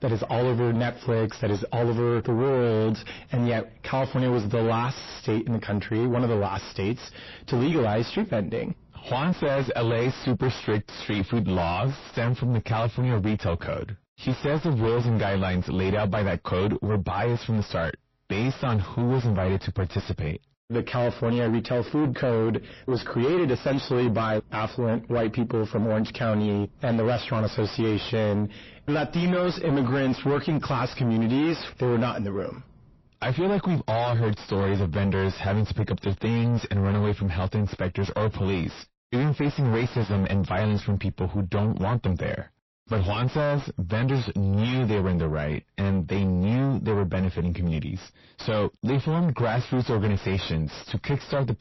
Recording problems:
distortion; heavy; 5 dB below the speech
garbled, watery; slightly; nothing above 5.5 kHz

